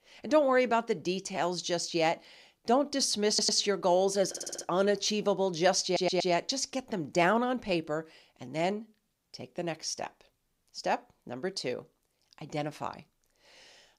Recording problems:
audio stuttering; at 3.5 s, at 4.5 s and at 6 s

